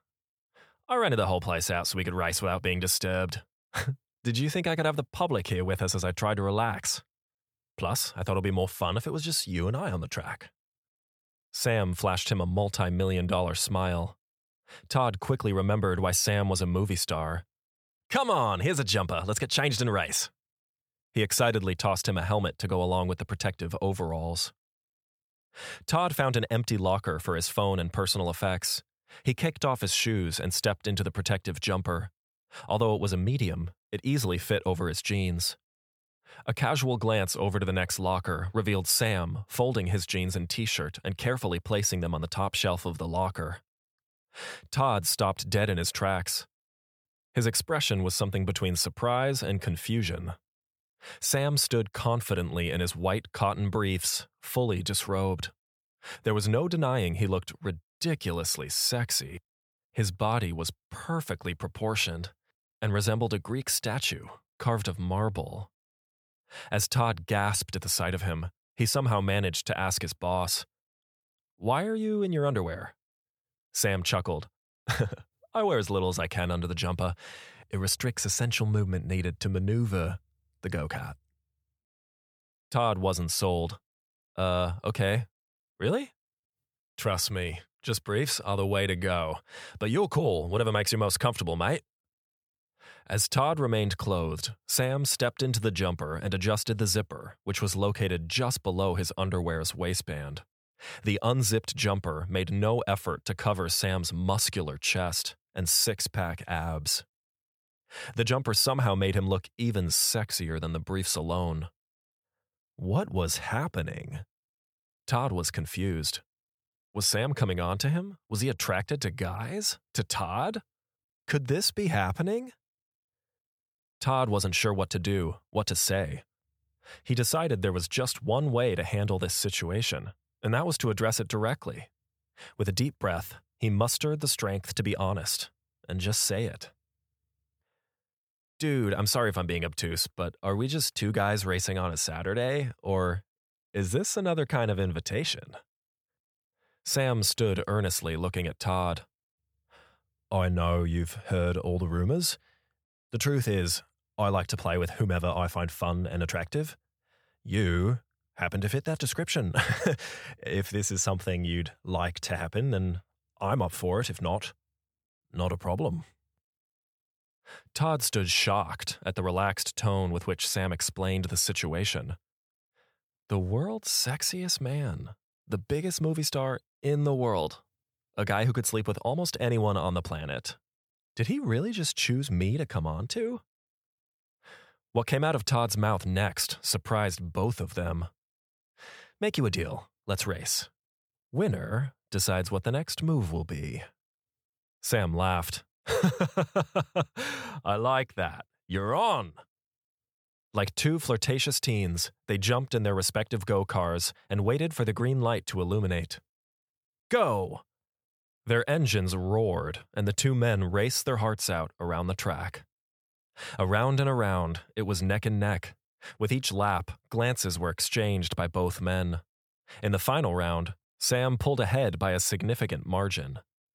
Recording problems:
none

